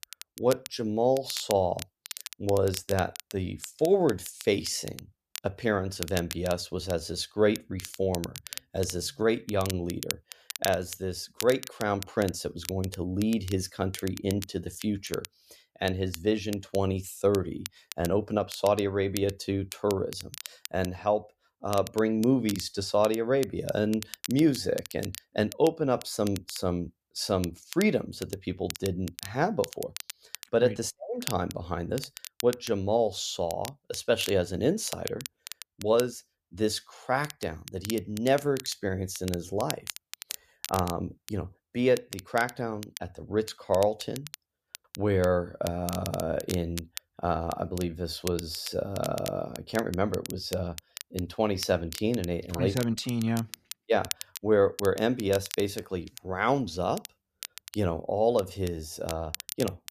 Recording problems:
crackle, like an old record; noticeable; 10 dB below the speech

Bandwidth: 14.5 kHz